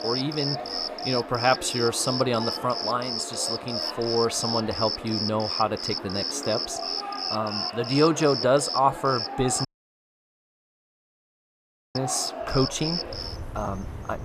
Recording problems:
animal sounds; loud; throughout; 3 dB below the speech
audio cutting out; at 9.5 s for 2.5 s

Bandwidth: 14.5 kHz